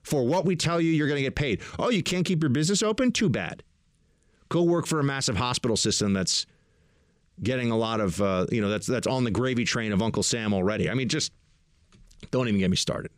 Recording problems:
none

